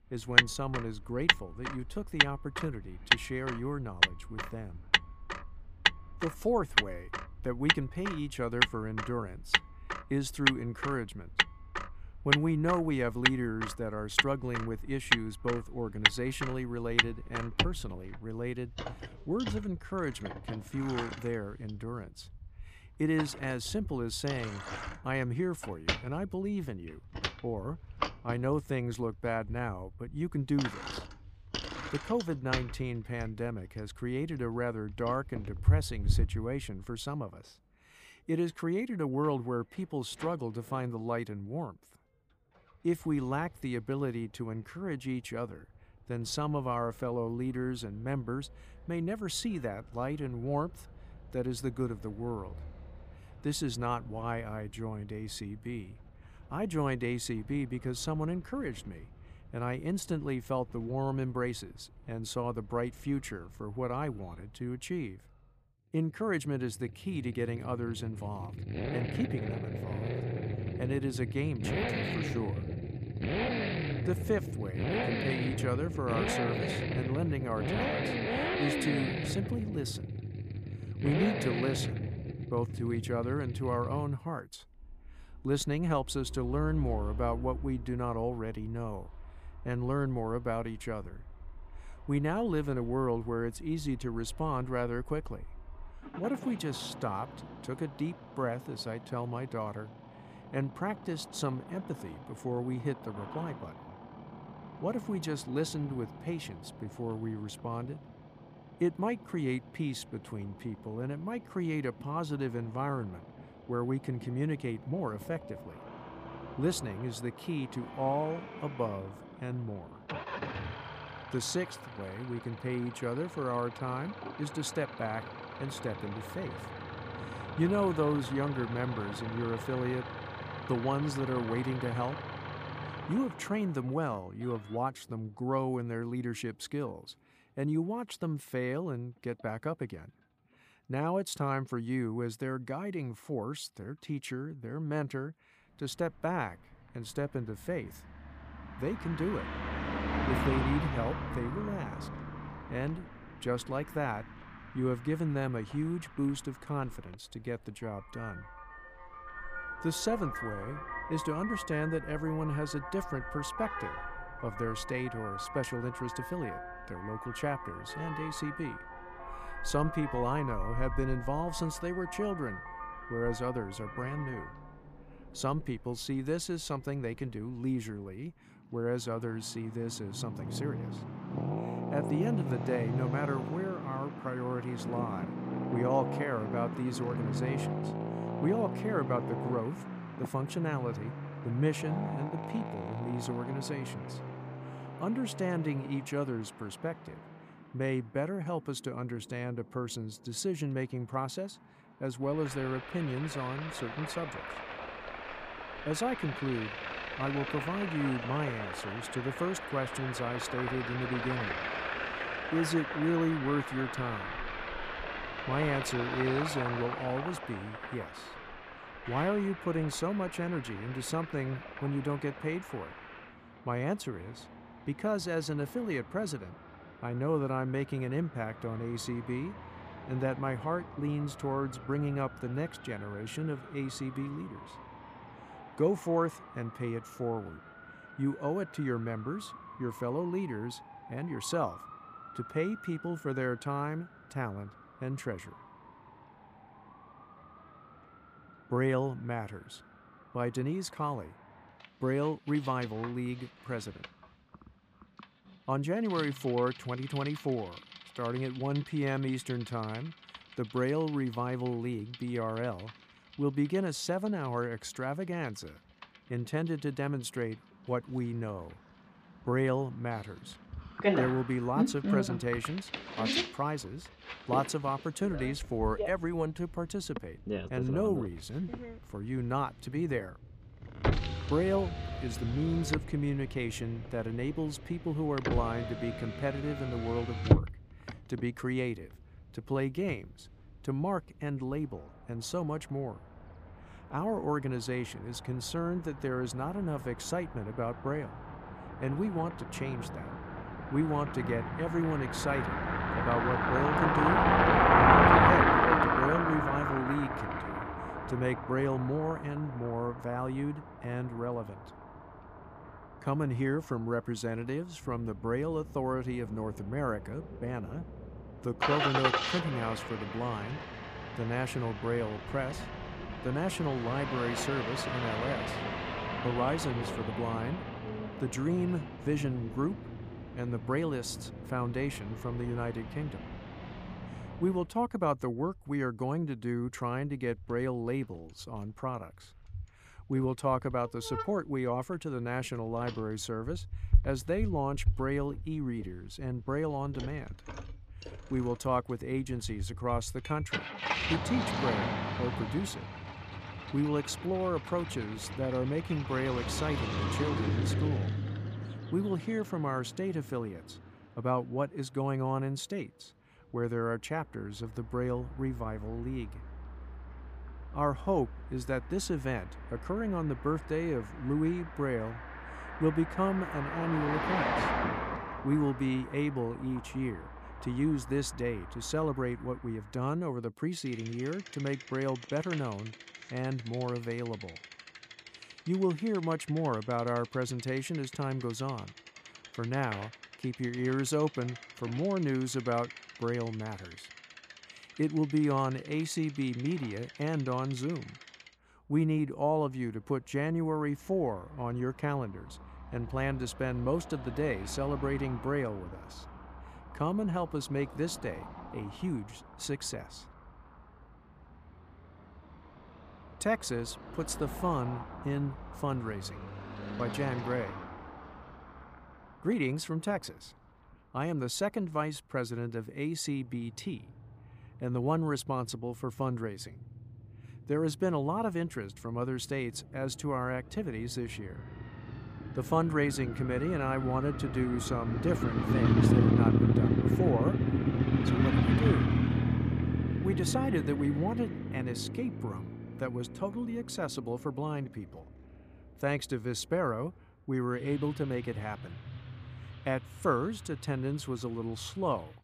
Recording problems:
traffic noise; loud; throughout; 1 dB below the speech

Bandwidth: 15 kHz